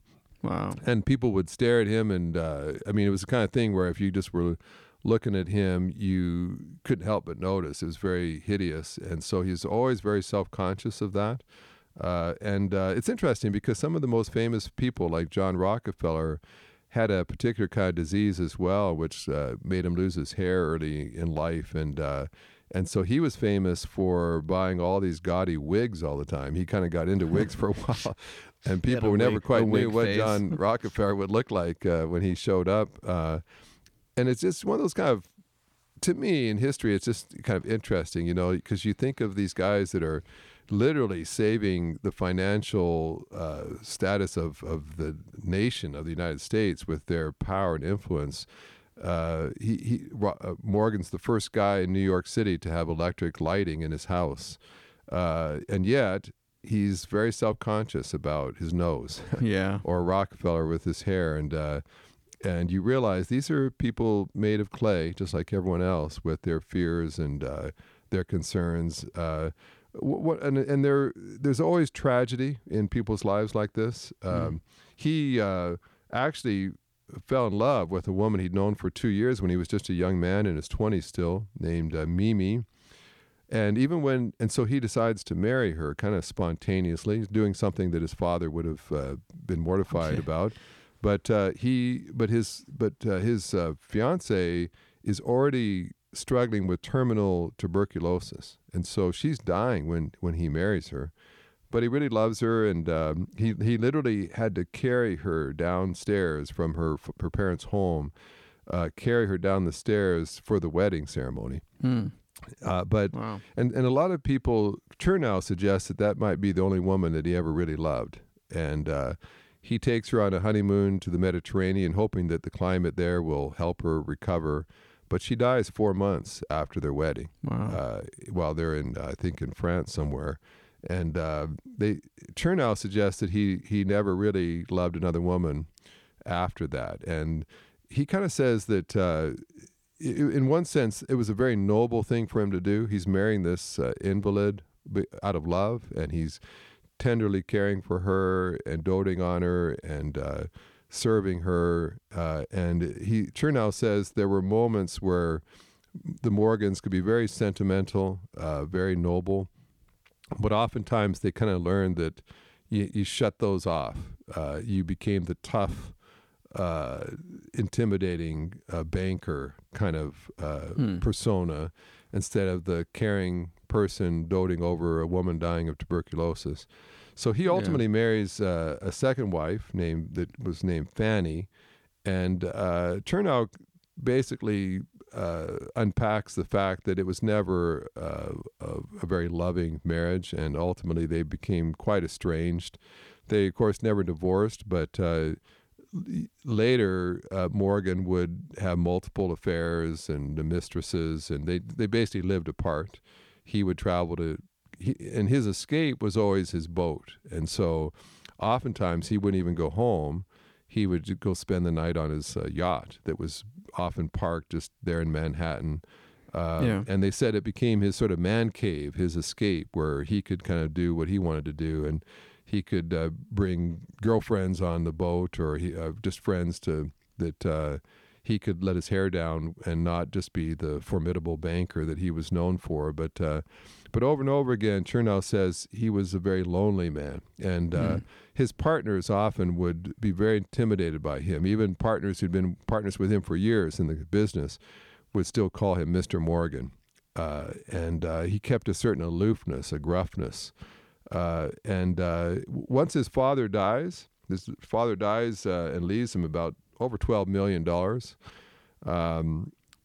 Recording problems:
none

